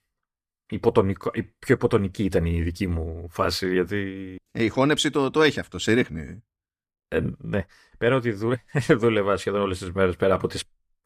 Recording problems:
none

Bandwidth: 14.5 kHz